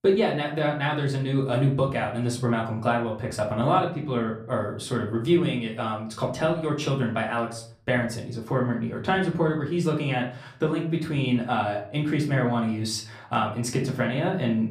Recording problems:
off-mic speech; far
room echo; slight; dies away in 0.4 s

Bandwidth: 15 kHz